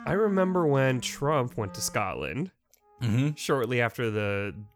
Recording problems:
background music; noticeable; throughout; 20 dB below the speech

